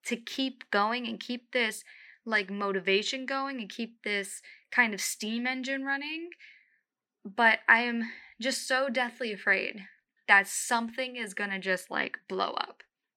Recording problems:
thin; somewhat; fading below 300 Hz

